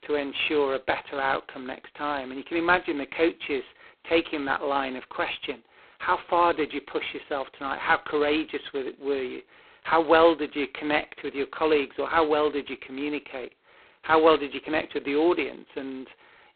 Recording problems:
phone-call audio; poor line; nothing above 4 kHz

